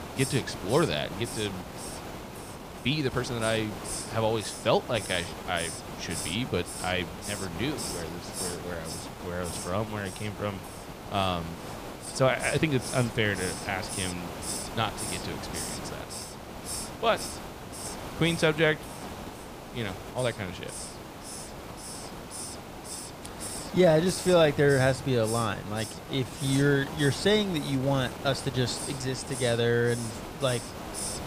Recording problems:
hiss; loud; throughout; 9 dB below the speech
uneven, jittery; strongly; from 2.5 to 29 s

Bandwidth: 15 kHz